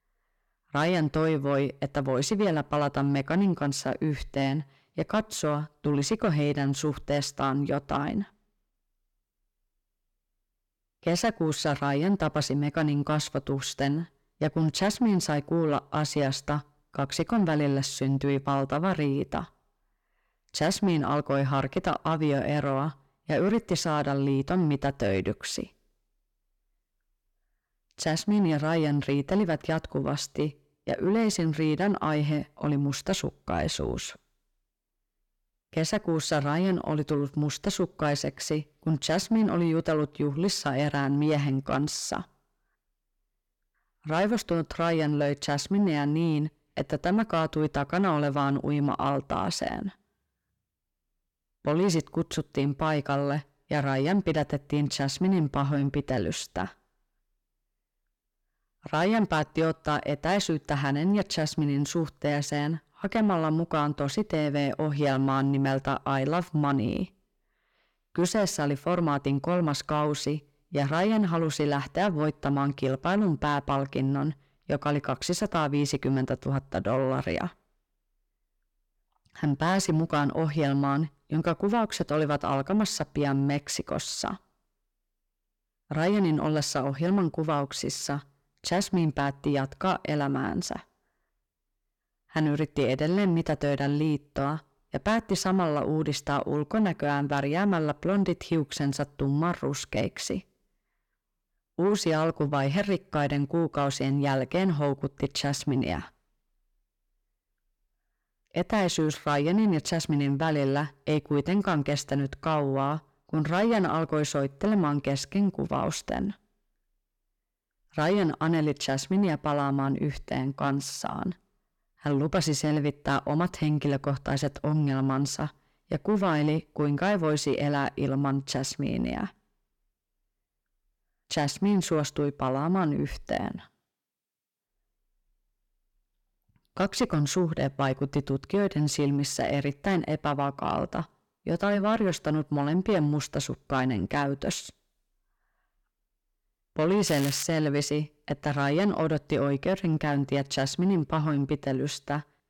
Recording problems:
distortion; slight; 10 dB below the speech
crackling; noticeable; at 2:27; 10 dB below the speech

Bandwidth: 17.5 kHz